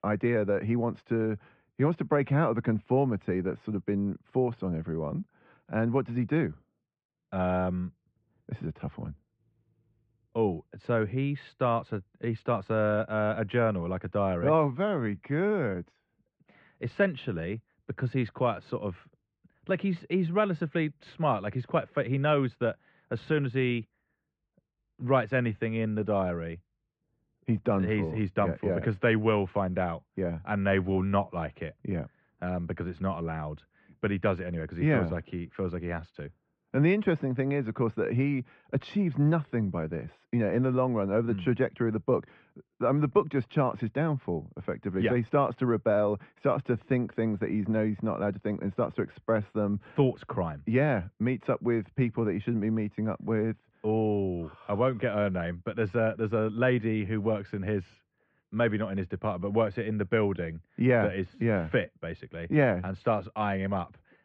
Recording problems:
muffled; very; fading above 3 kHz

